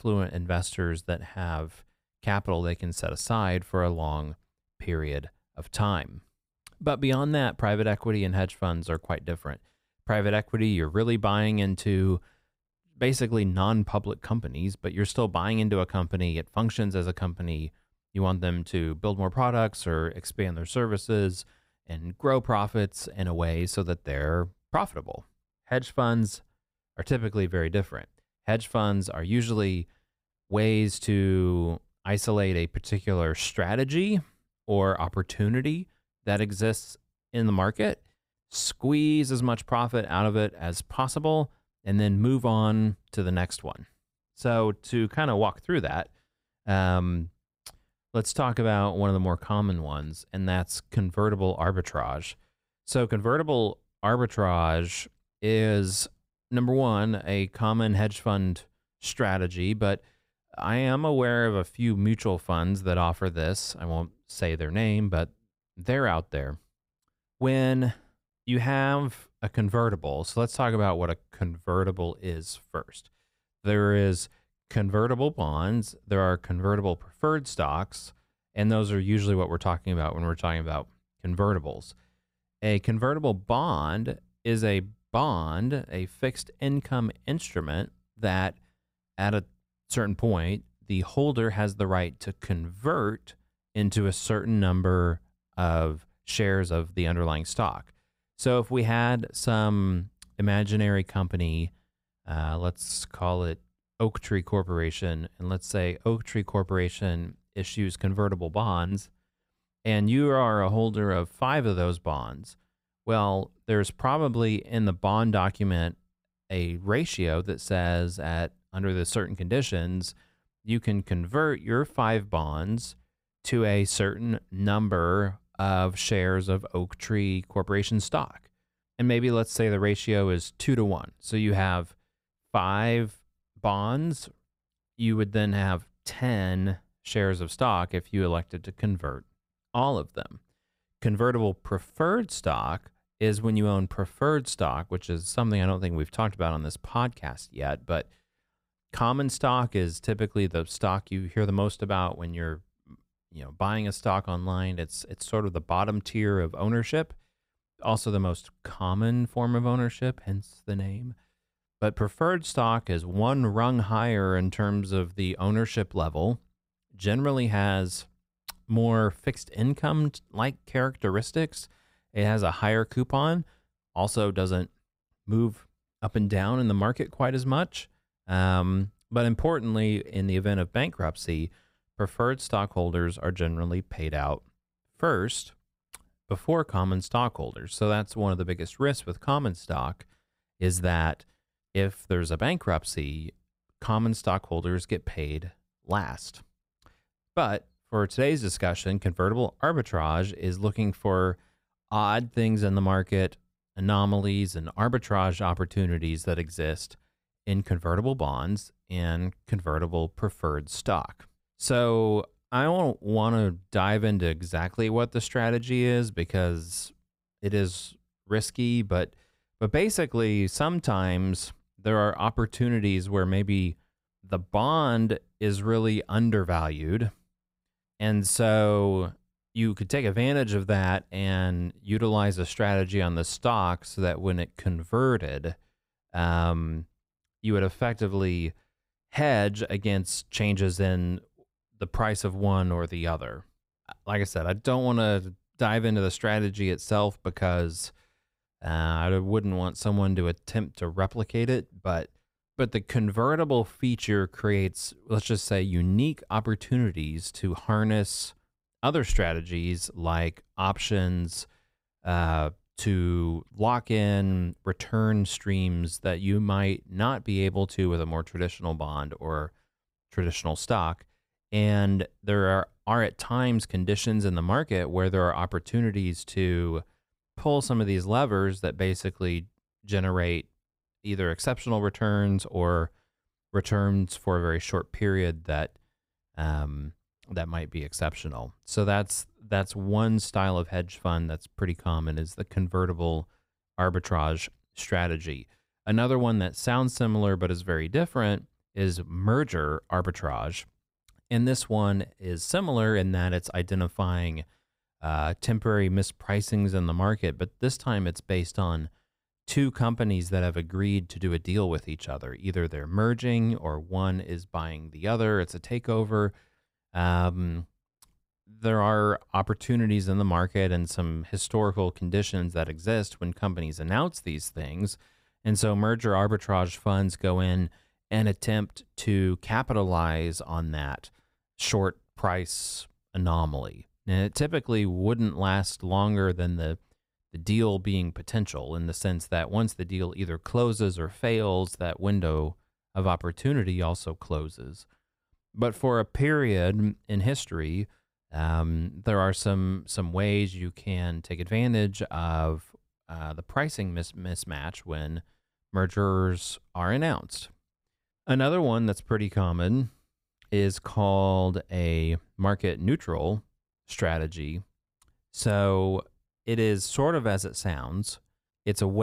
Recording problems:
abrupt cut into speech; at the end

